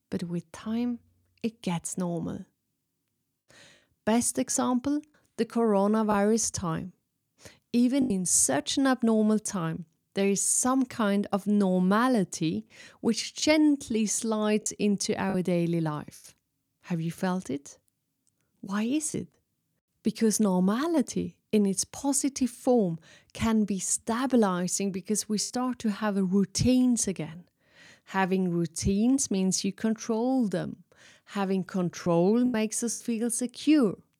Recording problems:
choppy; occasionally; 2% of the speech affected

